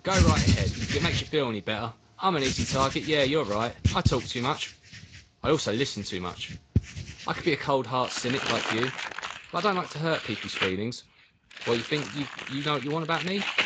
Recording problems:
garbled, watery; slightly; nothing above 7.5 kHz
household noises; loud; throughout; 2 dB below the speech

